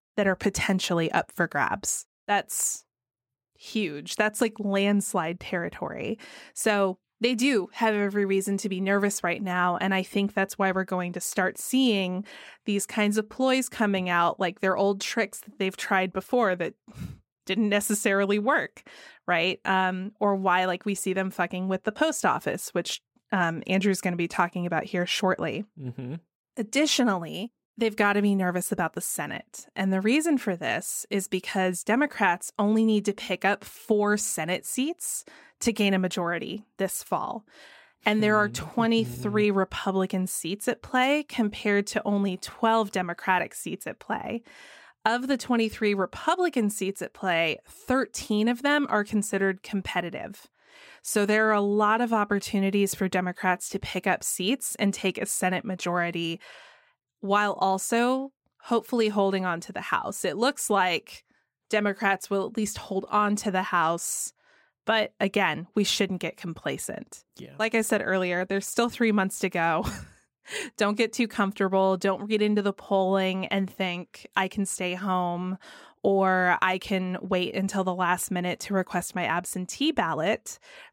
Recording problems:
none

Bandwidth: 16 kHz